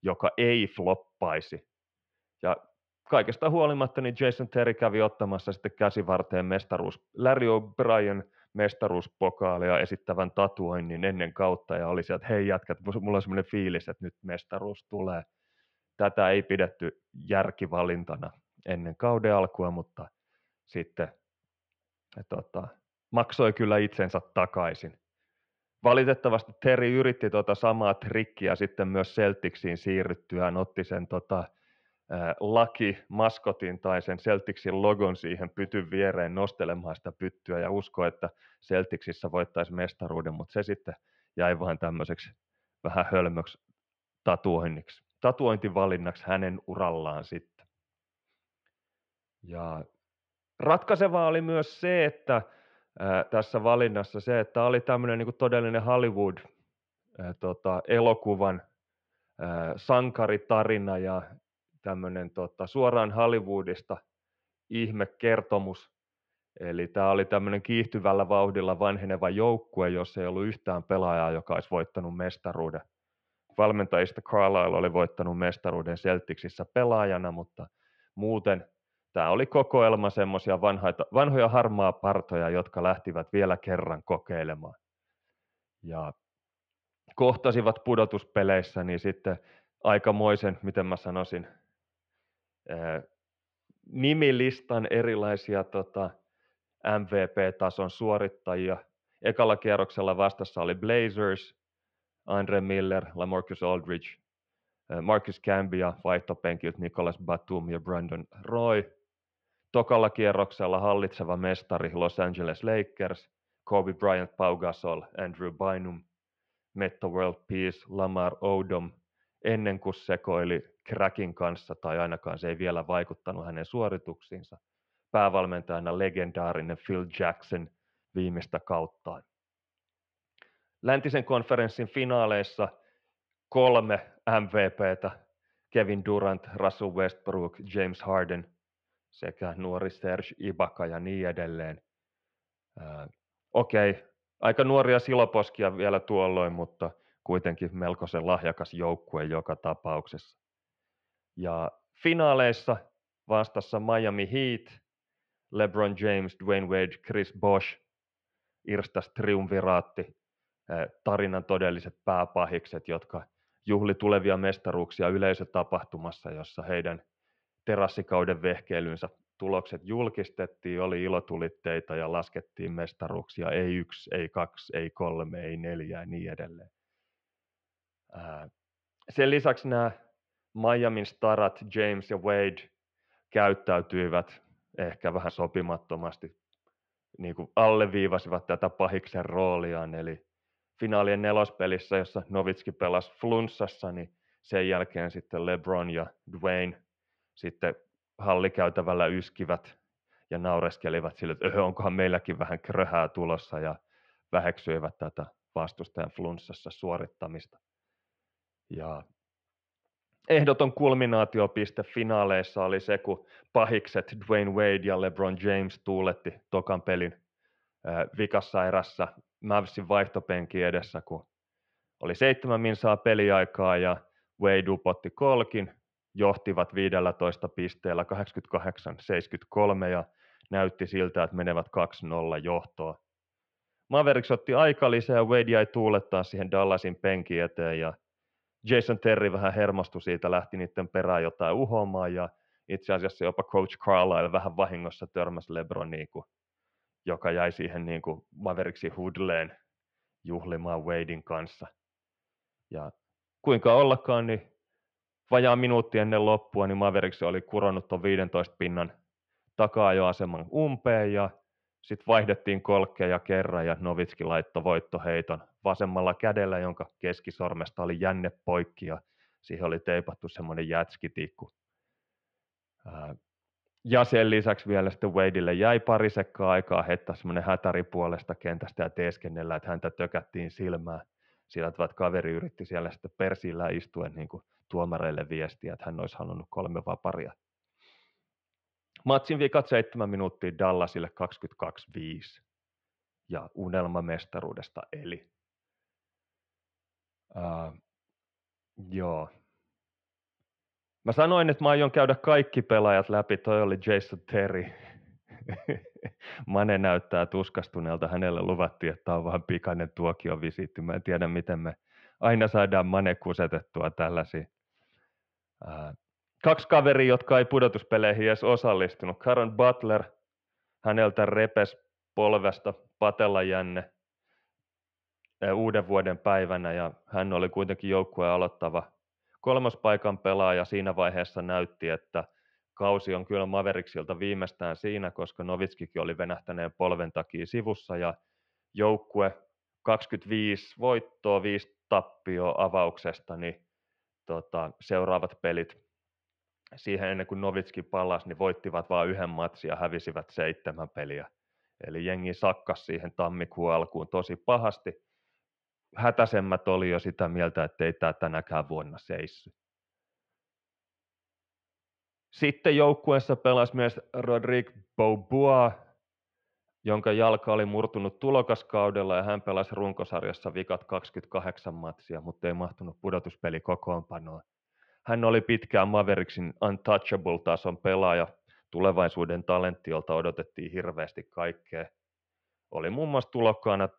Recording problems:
muffled; very; fading above 3 kHz

